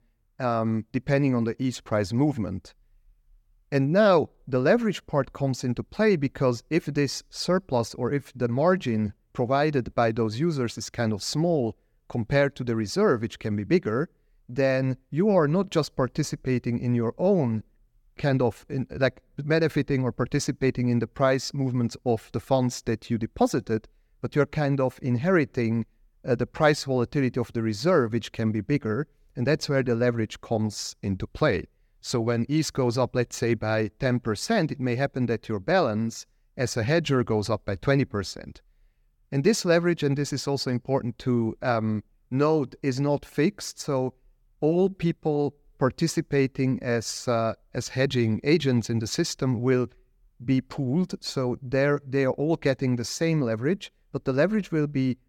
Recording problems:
none

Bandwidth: 17.5 kHz